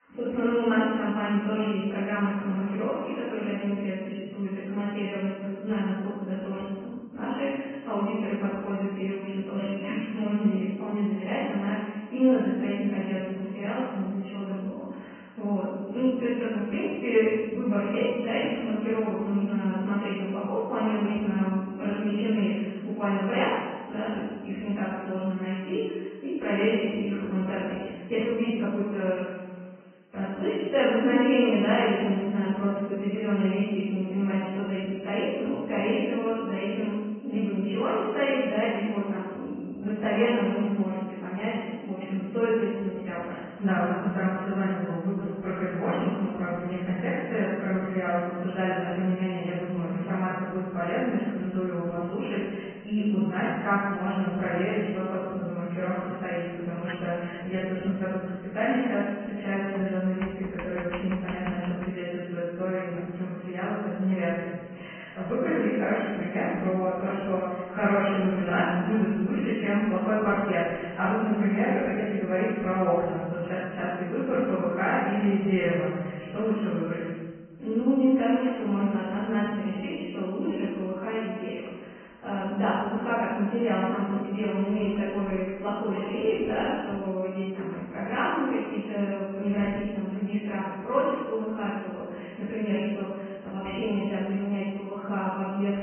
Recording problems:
room echo; strong; dies away in 1.3 s
off-mic speech; far
high frequencies cut off; severe; nothing above 3 kHz
garbled, watery; slightly
household noises; very faint; from 55 s on; 20 dB below the speech
uneven, jittery; strongly; from 2.5 to 44 s

